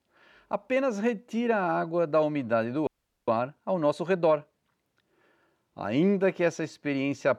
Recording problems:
audio freezing; at 3 s

